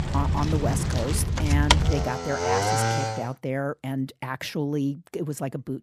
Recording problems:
traffic noise; very loud; until 3 s; 5 dB above the speech

